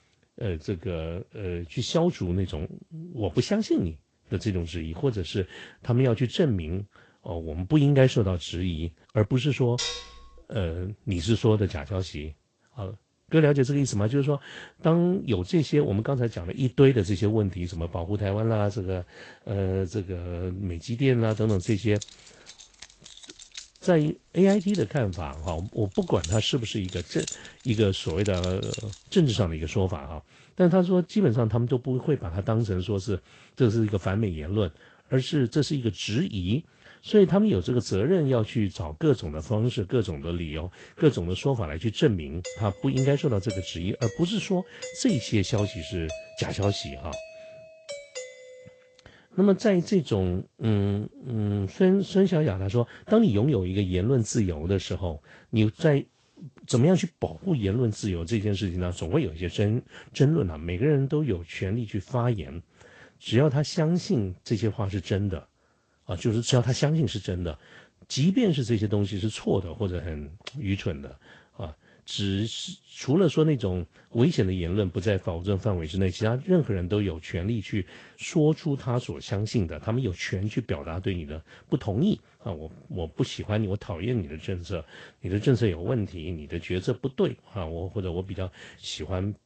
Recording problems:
garbled, watery; slightly; nothing above 8 kHz
clattering dishes; noticeable; at 10 s; peak 4 dB below the speech
jangling keys; noticeable; from 21 to 29 s; peak 9 dB below the speech
doorbell; faint; from 42 to 49 s; peak 10 dB below the speech

